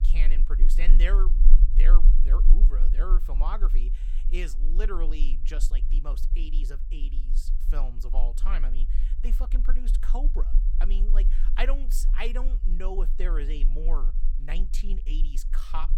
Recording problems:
low rumble; noticeable; throughout; 15 dB below the speech

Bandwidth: 17 kHz